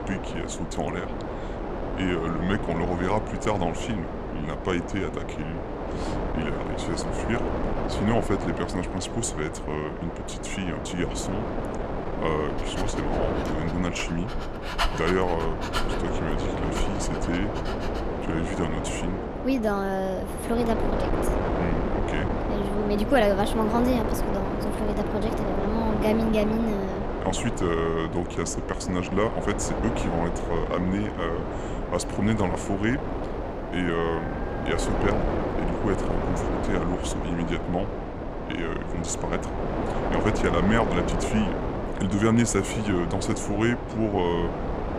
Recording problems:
wind noise on the microphone; heavy; 2 dB below the speech
dog barking; loud; from 13 to 18 s; peak level with the speech
dog barking; faint; from 33 to 36 s; peak 10 dB below the speech

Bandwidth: 14.5 kHz